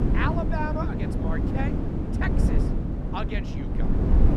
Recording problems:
wind noise on the microphone; heavy; 2 dB below the speech

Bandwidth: 14.5 kHz